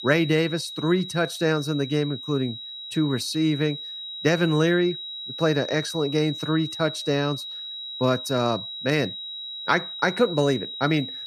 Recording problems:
high-pitched whine; loud; throughout; 4 kHz, 8 dB below the speech

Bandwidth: 14.5 kHz